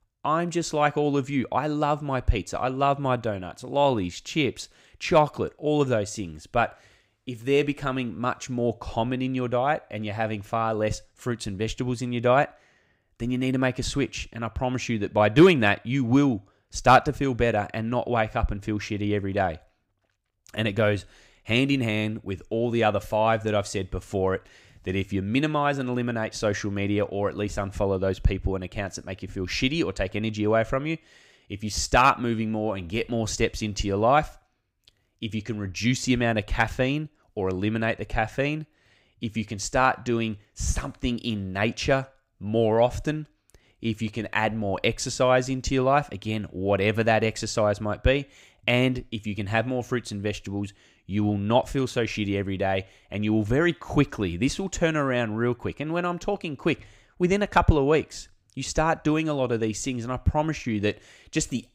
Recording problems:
none

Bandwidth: 15.5 kHz